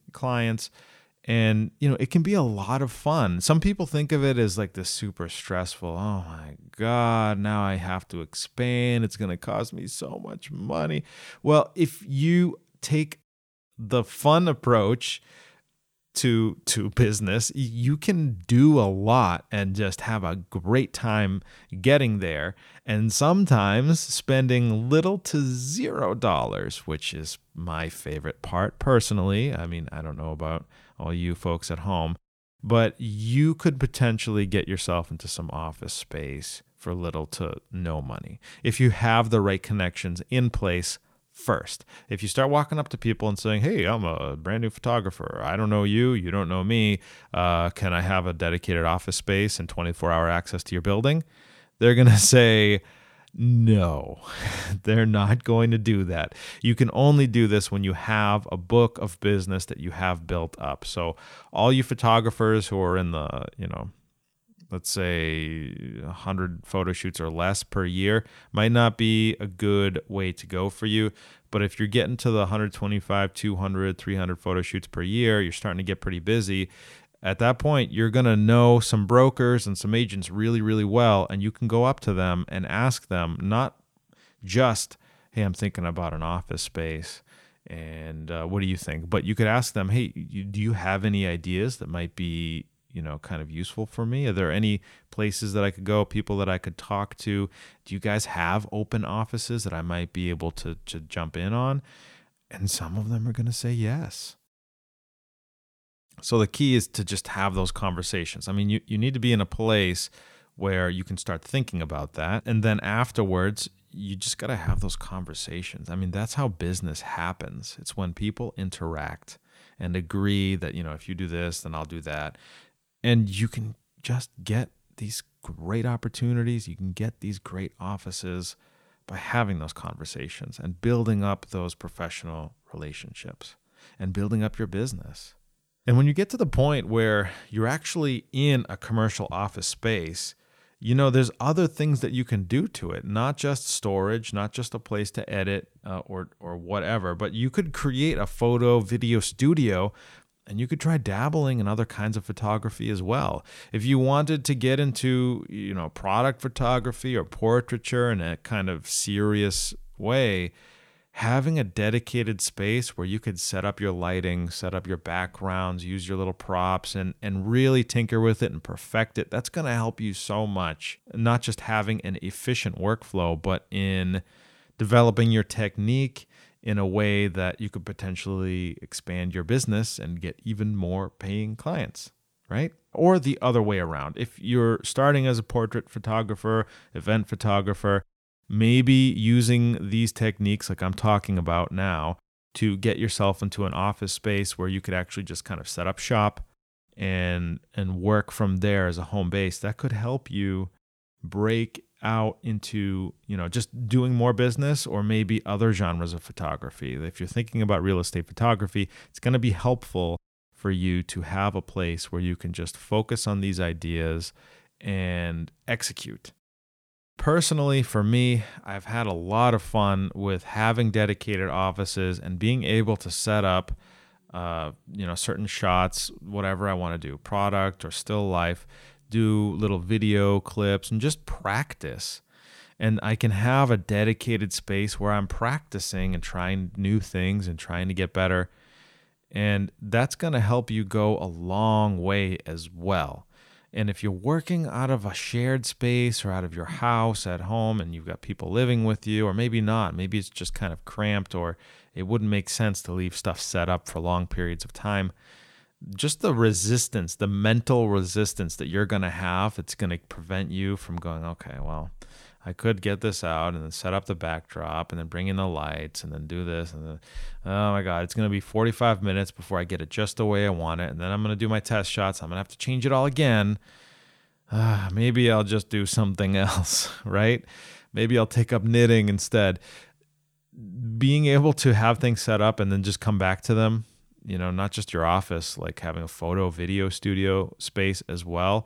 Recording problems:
none

